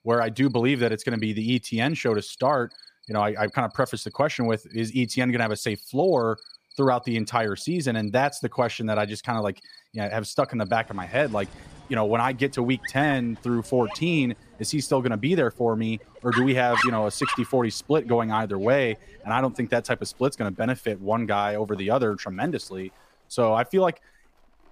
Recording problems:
animal sounds; noticeable; throughout; 10 dB below the speech

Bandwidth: 15 kHz